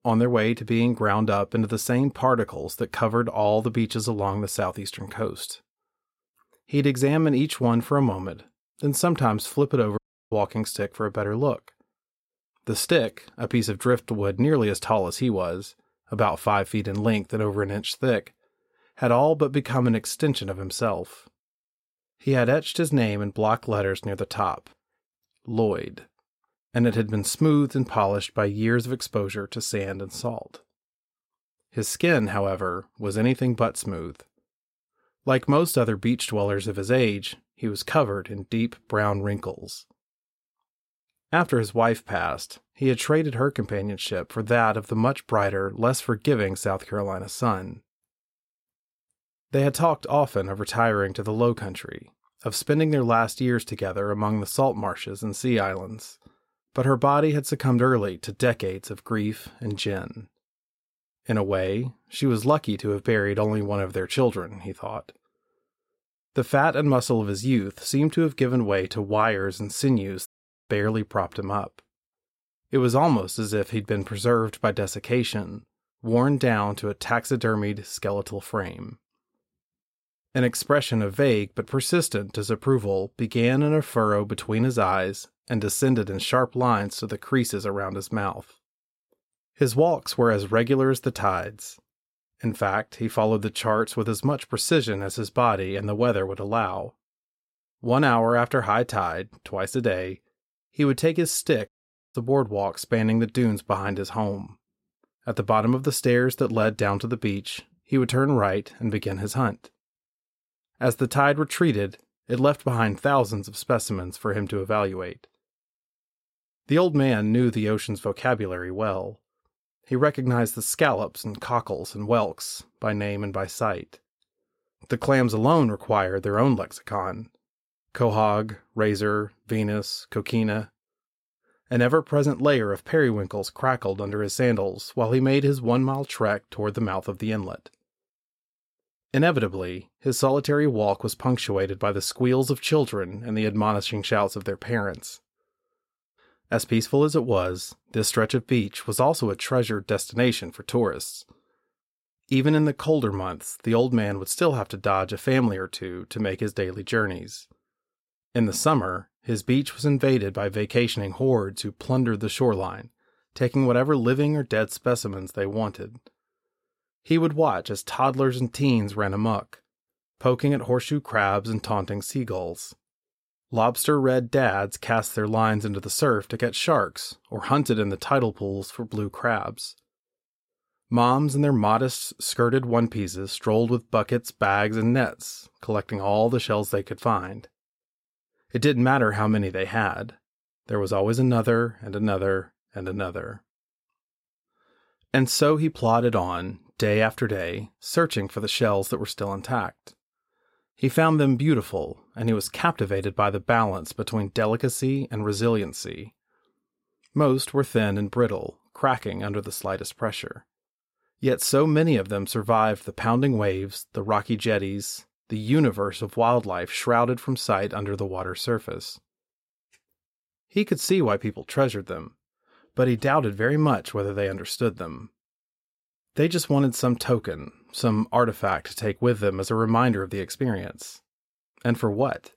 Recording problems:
audio cutting out; at 10 s, at 1:10 and at 1:42

